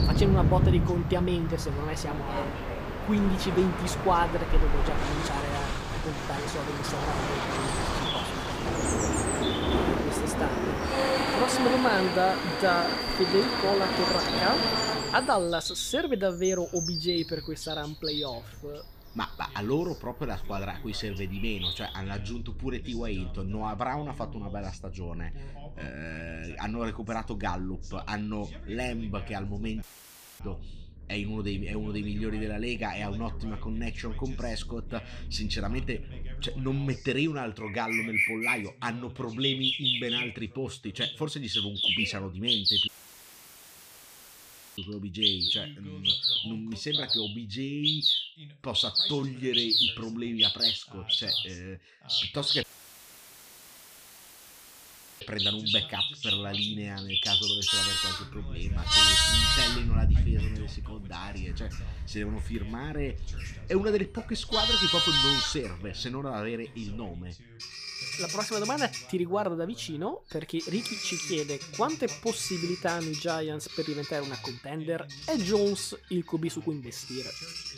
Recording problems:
animal sounds; very loud; throughout; 5 dB above the speech
train or aircraft noise; very loud; until 15 s; 4 dB above the speech
voice in the background; noticeable; throughout; 20 dB below the speech
audio cutting out; at 30 s for 0.5 s, at 43 s for 2 s and at 53 s for 2.5 s

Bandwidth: 15 kHz